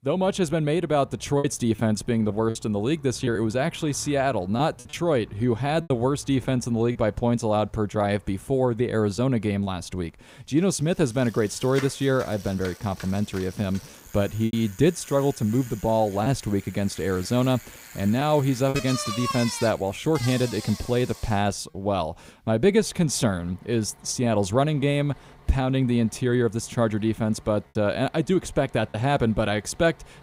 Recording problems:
traffic noise; noticeable; throughout; 15 dB below the speech
choppy; occasionally; 3% of the speech affected

